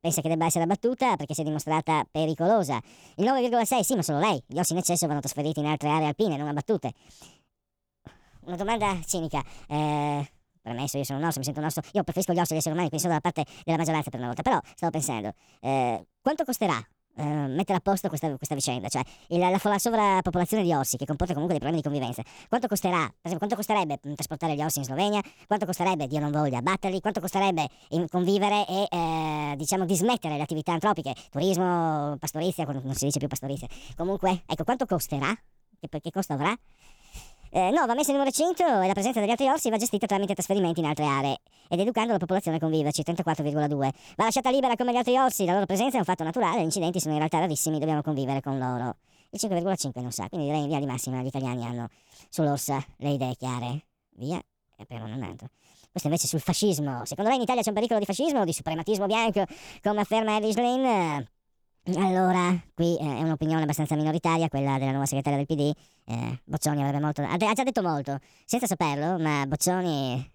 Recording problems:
wrong speed and pitch; too fast and too high; 1.6 times normal speed

